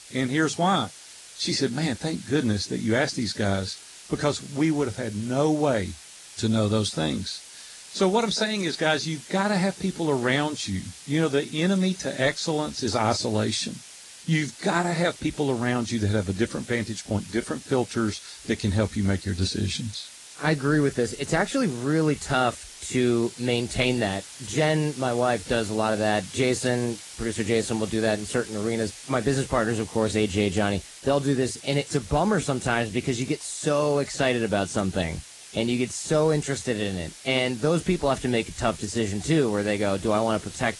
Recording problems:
garbled, watery; slightly
hiss; noticeable; throughout; 15 dB below the speech
uneven, jittery; slightly; from 11 to 31 s

